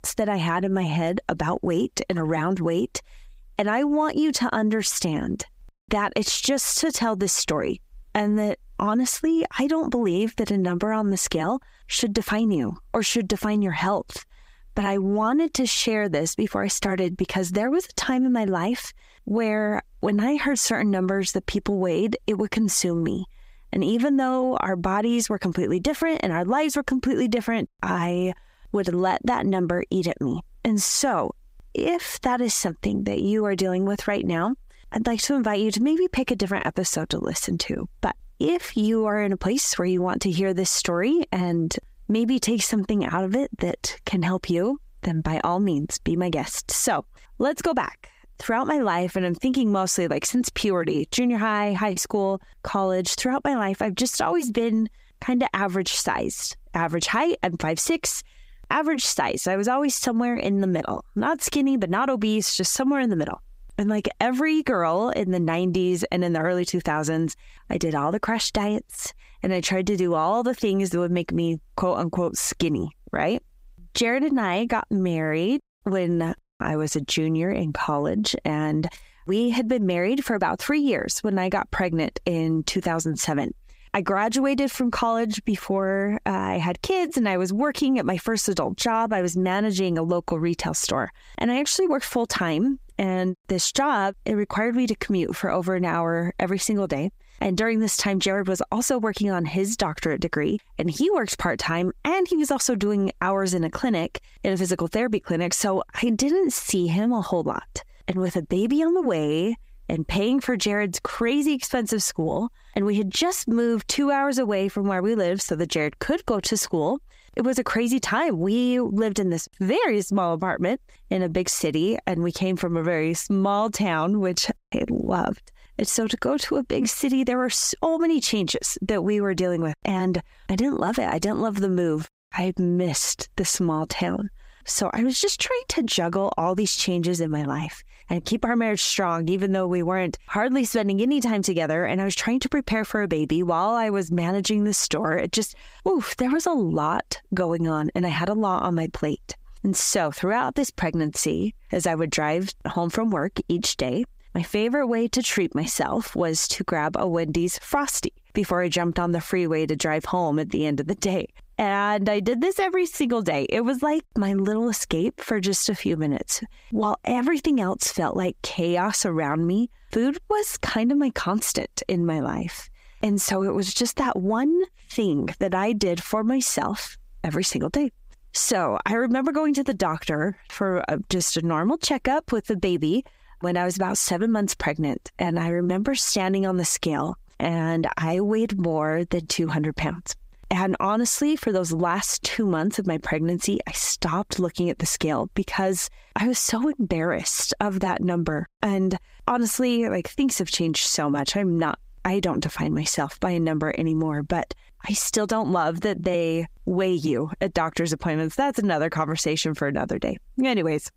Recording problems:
squashed, flat; somewhat

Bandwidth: 15.5 kHz